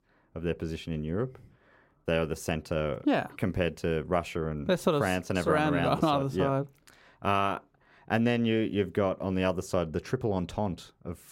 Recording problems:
none

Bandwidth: 16 kHz